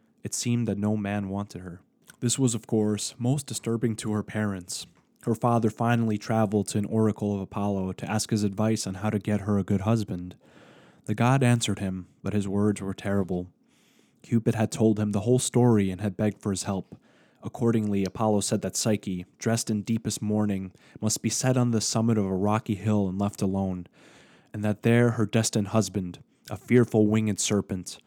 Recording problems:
none

